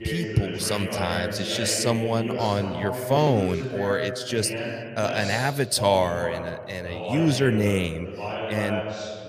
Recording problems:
voice in the background; loud; throughout; 6 dB below the speech

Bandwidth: 15 kHz